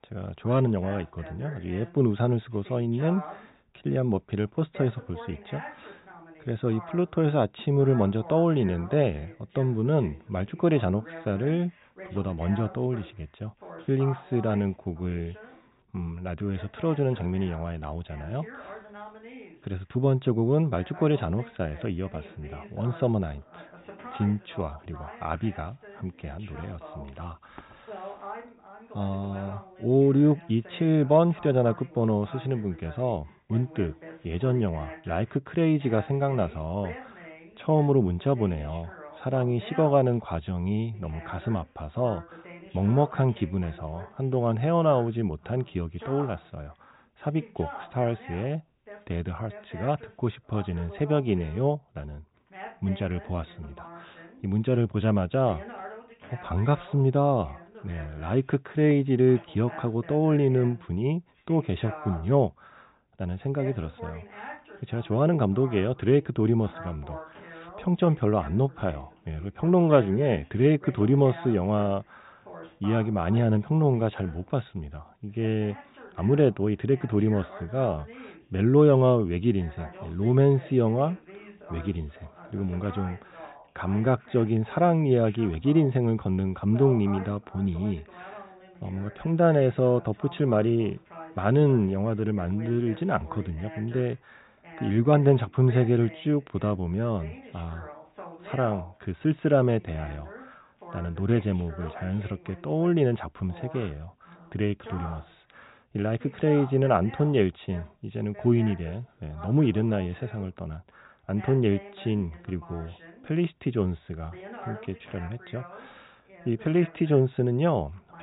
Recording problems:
high frequencies cut off; severe; nothing above 4 kHz
voice in the background; noticeable; throughout; 20 dB below the speech

